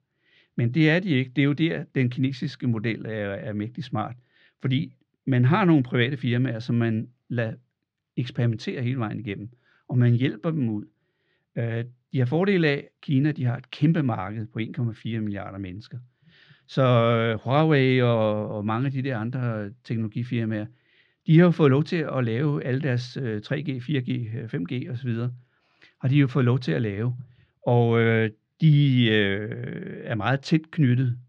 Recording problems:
muffled; very slightly; fading above 4 kHz

